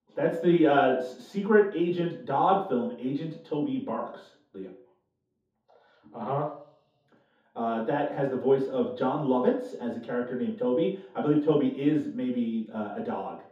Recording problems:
off-mic speech; far
room echo; noticeable; dies away in 0.5 s

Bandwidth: 15 kHz